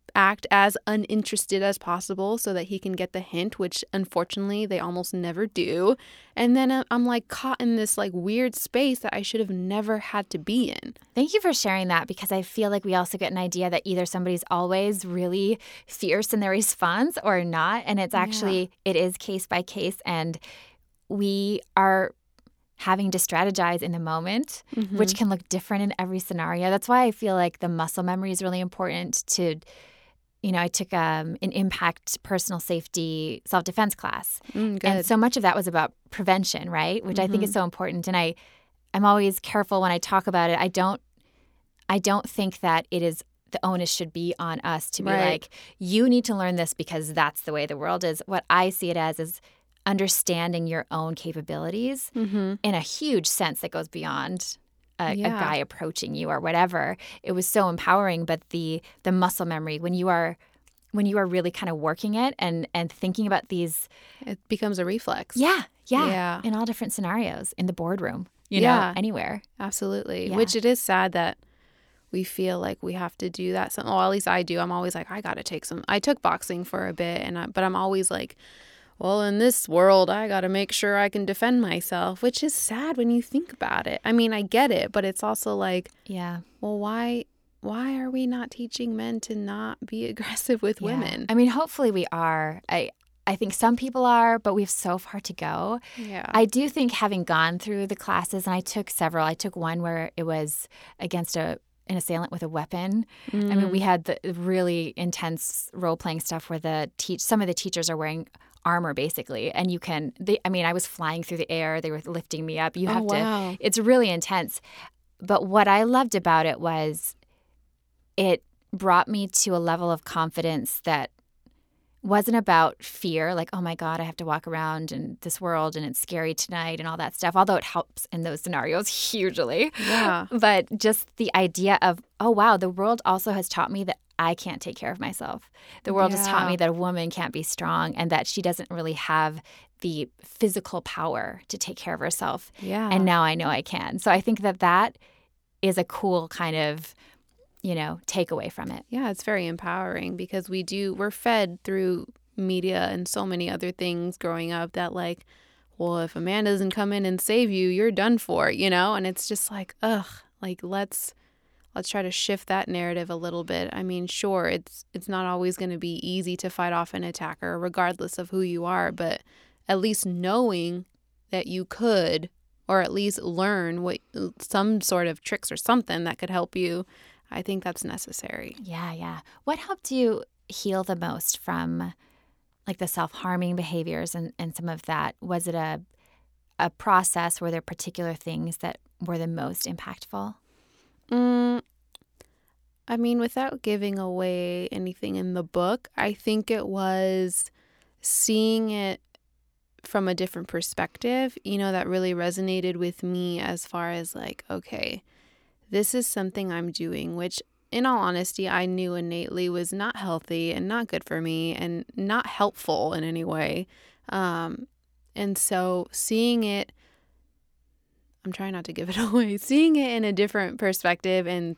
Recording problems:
none

